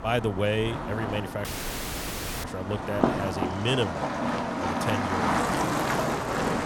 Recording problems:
traffic noise; very loud; throughout; 2 dB above the speech
audio cutting out; at 1.5 s for 1 s

